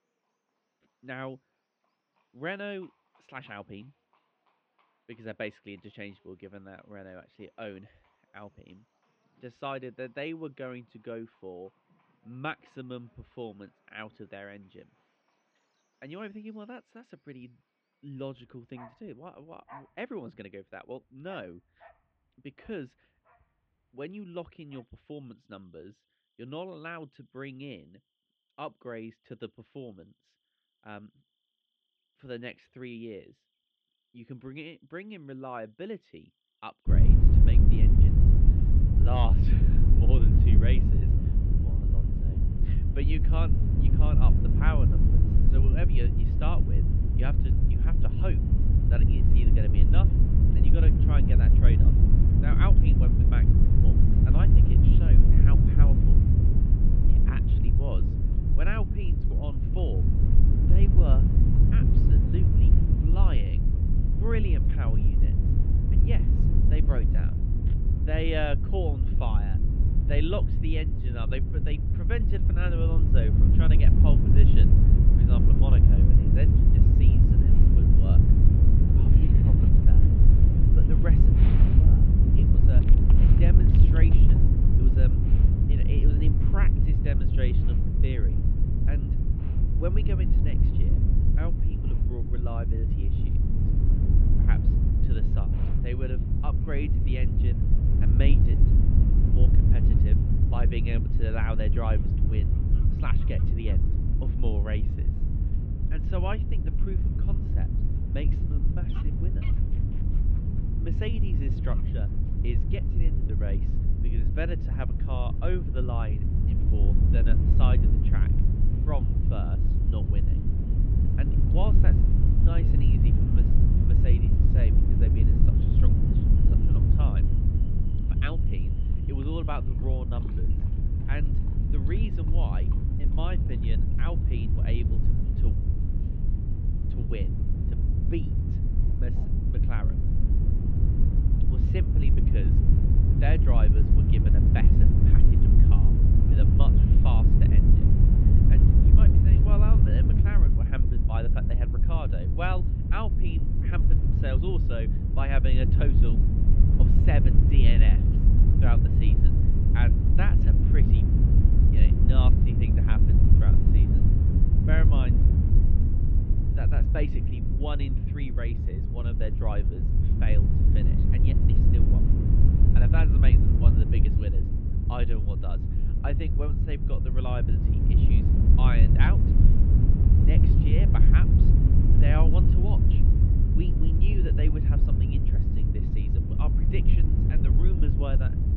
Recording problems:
muffled; very; fading above 3 kHz
low rumble; very loud; from 37 s on; 1 dB above the speech
animal sounds; noticeable; until 2:19; 15 dB below the speech

